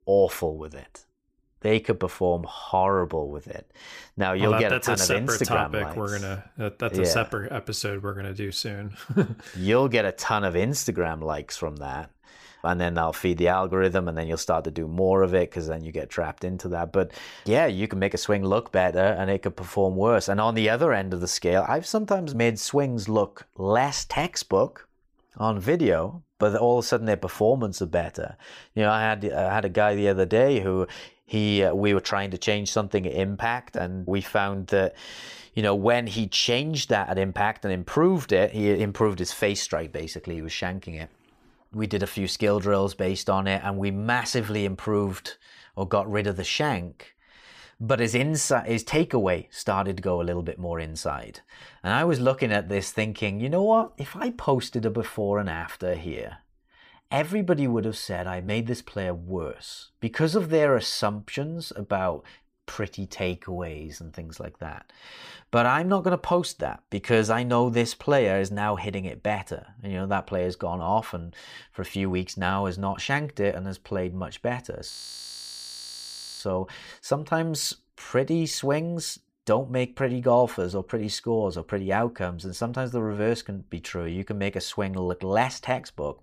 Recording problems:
audio freezing; at 1:15 for 1.5 s

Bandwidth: 15 kHz